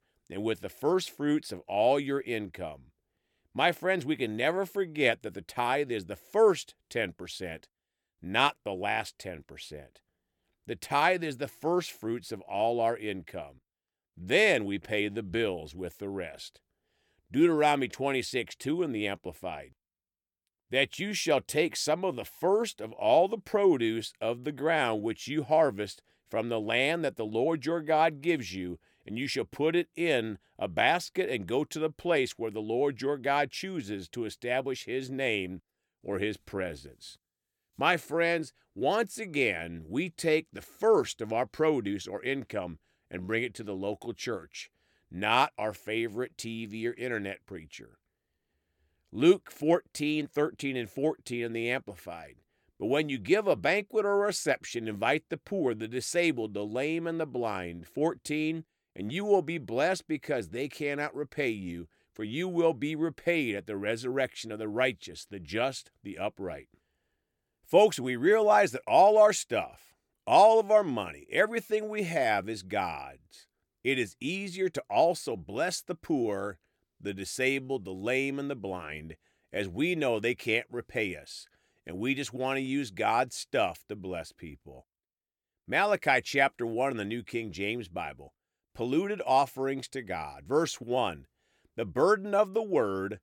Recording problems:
none

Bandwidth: 17.5 kHz